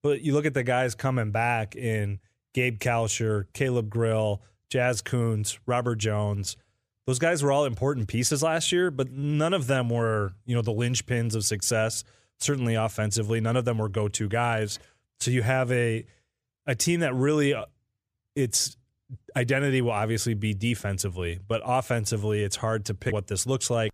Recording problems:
none

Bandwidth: 14.5 kHz